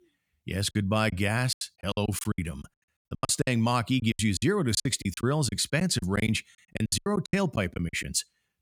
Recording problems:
choppy; very; 19% of the speech affected

